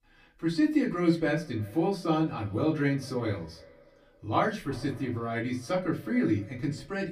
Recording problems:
off-mic speech; far
echo of what is said; faint; throughout; 320 ms later, 25 dB below the speech
room echo; very slight; dies away in 0.2 s

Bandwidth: 15 kHz